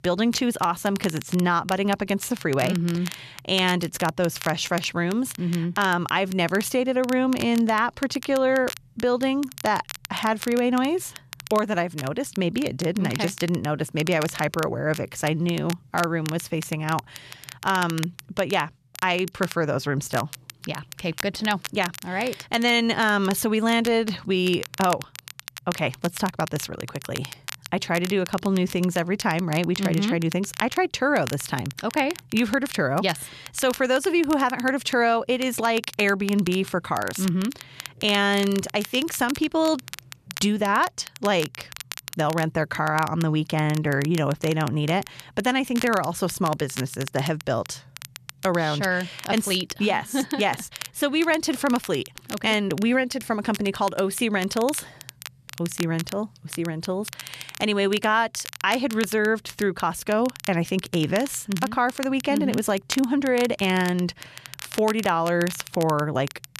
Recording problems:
crackle, like an old record; noticeable; 15 dB below the speech

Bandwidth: 14 kHz